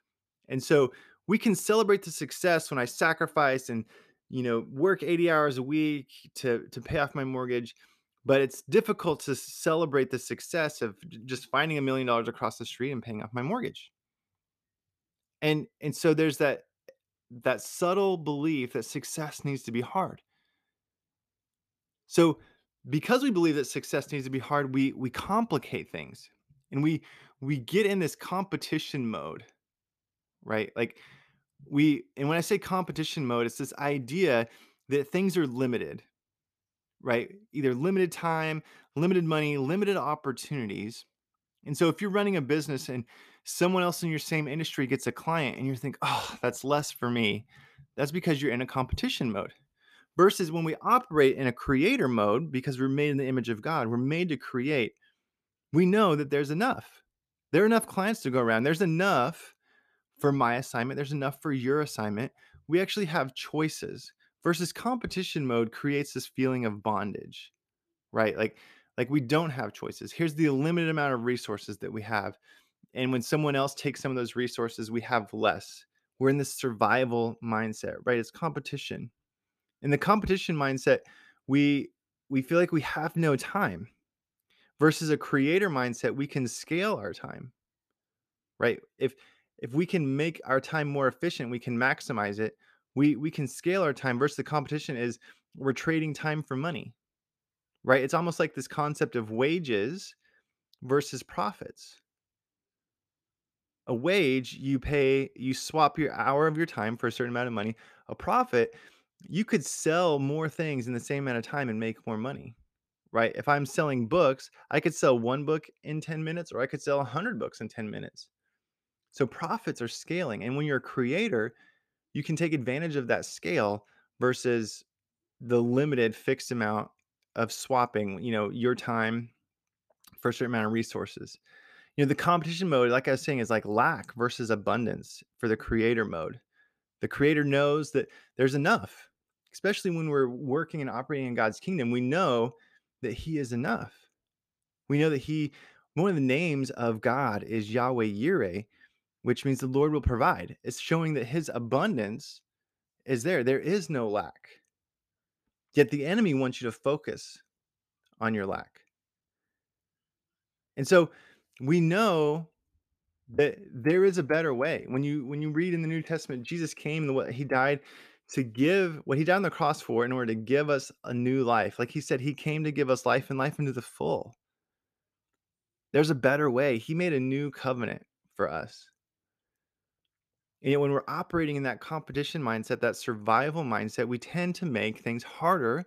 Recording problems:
none

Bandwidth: 14.5 kHz